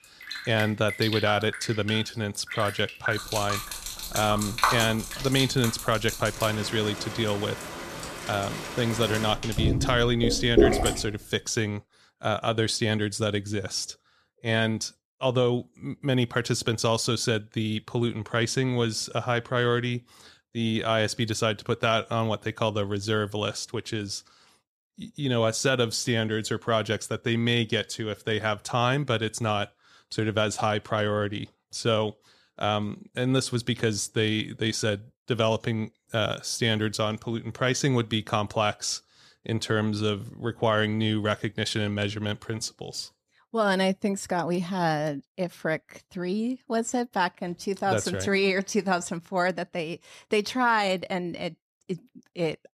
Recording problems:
rain or running water; loud; until 11 s; 3 dB below the speech

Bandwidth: 14 kHz